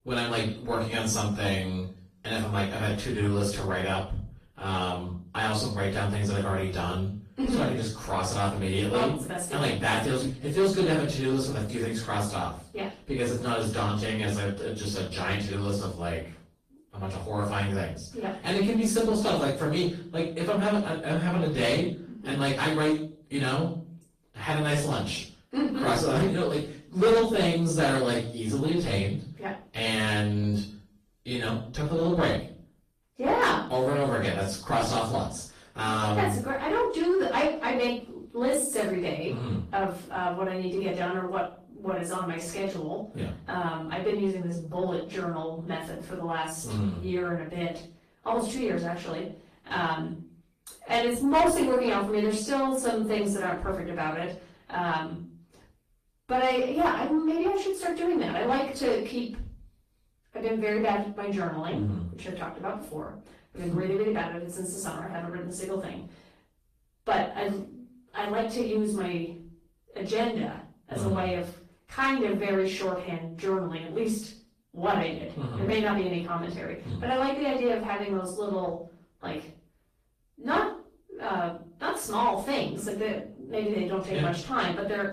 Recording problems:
off-mic speech; far
room echo; noticeable; dies away in 0.4 s
distortion; slight; 10 dB below the speech
garbled, watery; slightly; nothing above 14.5 kHz

